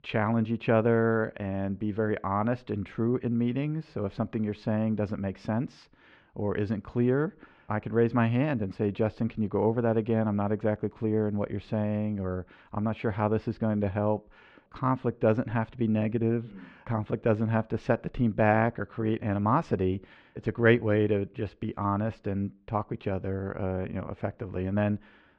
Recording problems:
muffled; slightly; fading above 3 kHz

